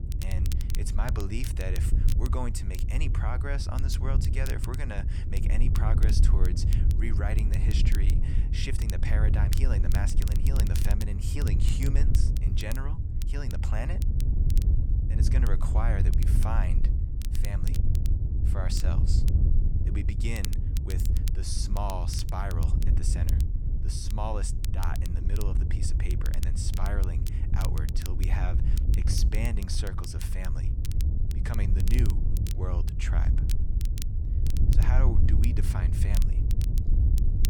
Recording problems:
wind noise on the microphone; heavy; 5 dB below the speech
crackle, like an old record; loud; 9 dB below the speech

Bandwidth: 18 kHz